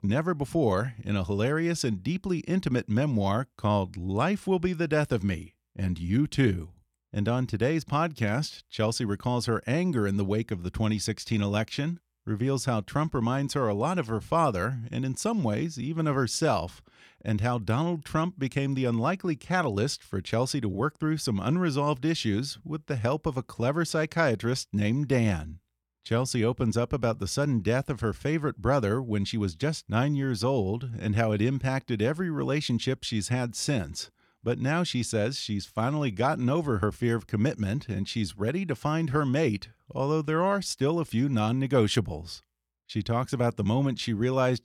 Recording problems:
none

